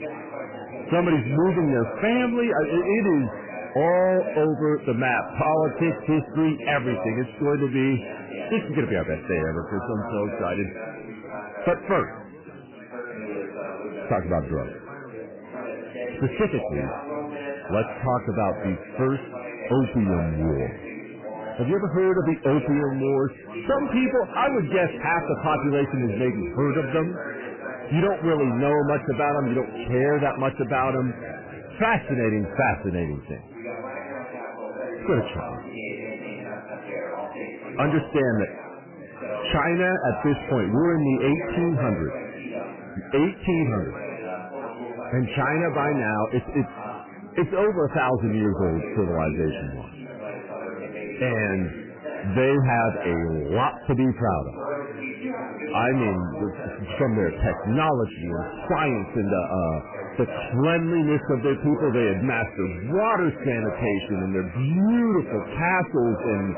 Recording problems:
garbled, watery; badly; nothing above 3 kHz
distortion; slight; 7% of the sound clipped
chatter from many people; noticeable; throughout; 10 dB below the speech

